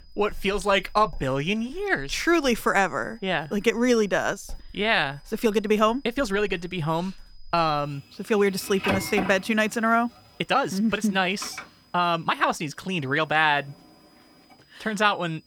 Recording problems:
household noises; noticeable; throughout; 10 dB below the speech
high-pitched whine; faint; throughout; 5 kHz, 35 dB below the speech
uneven, jittery; strongly; from 1 to 13 s

